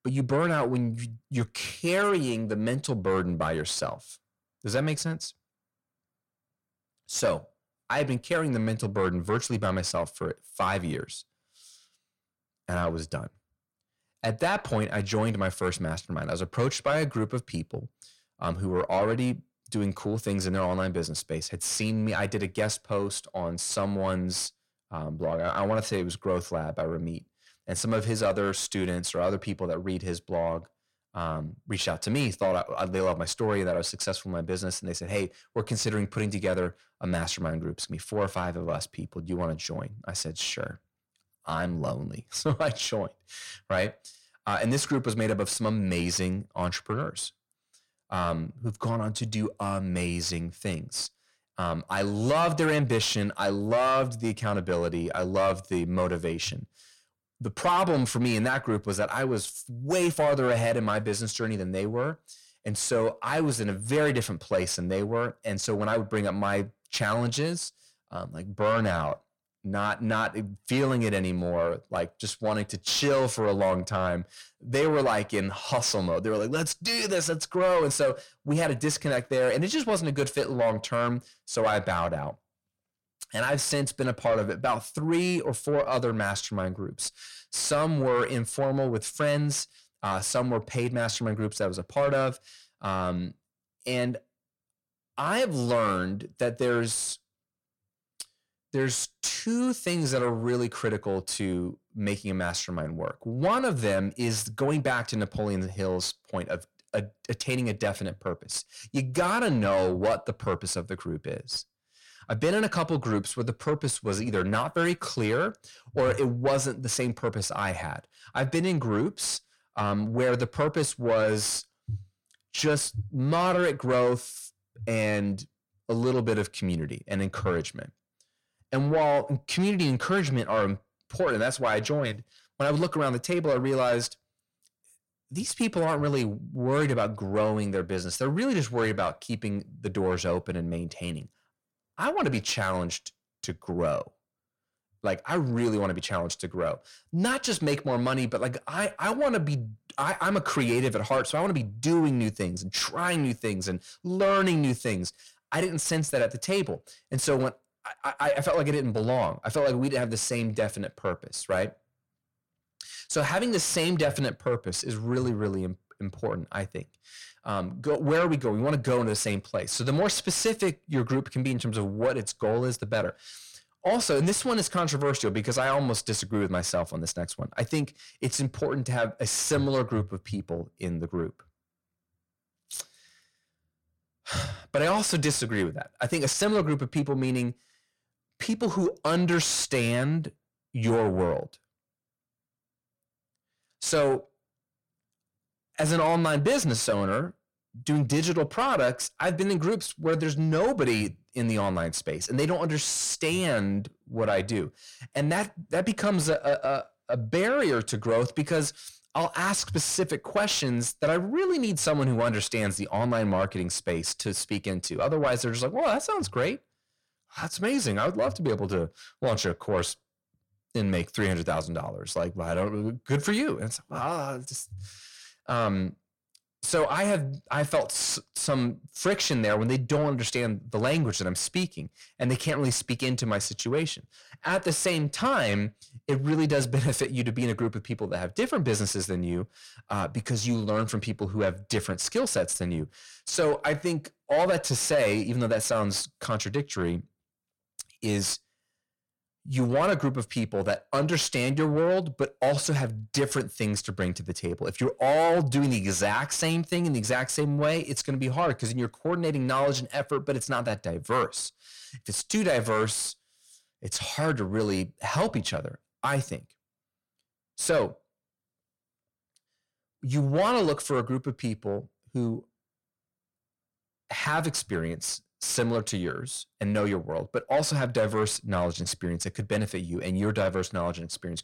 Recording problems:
distortion; slight; 10 dB below the speech

